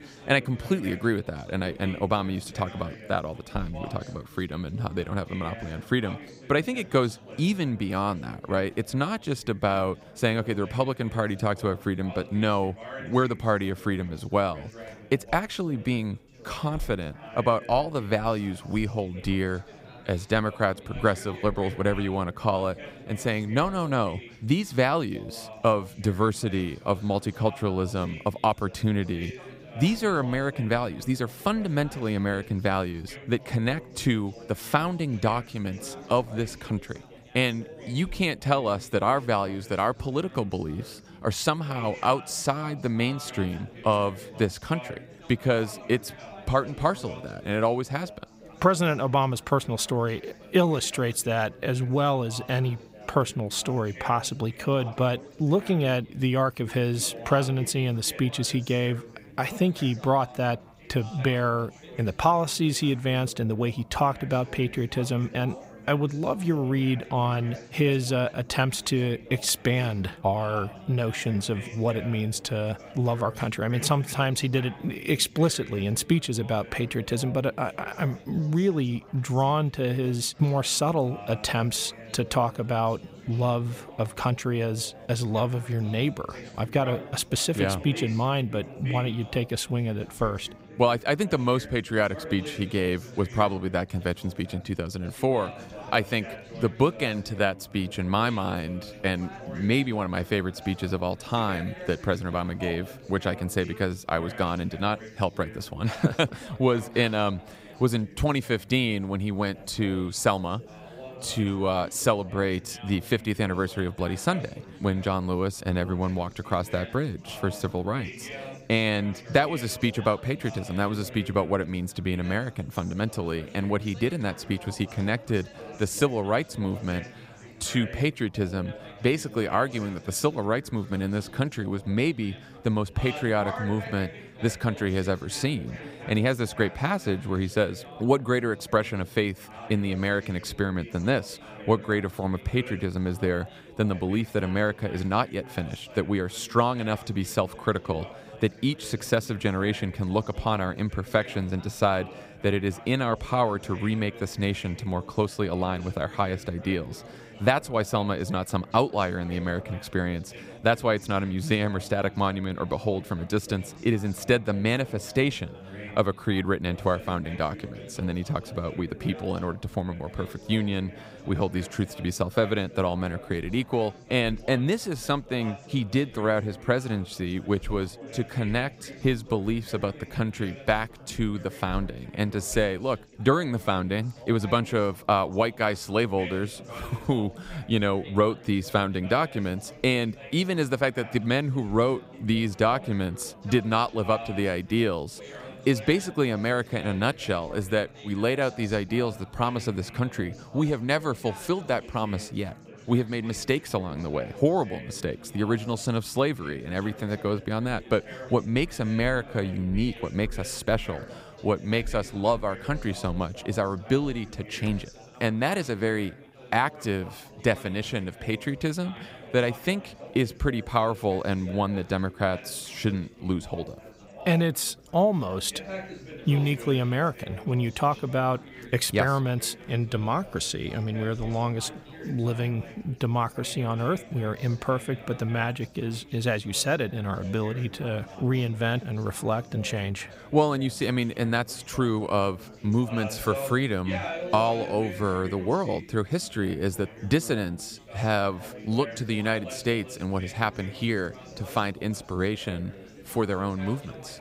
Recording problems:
chatter from many people; noticeable; throughout; 15 dB below the speech

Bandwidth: 15.5 kHz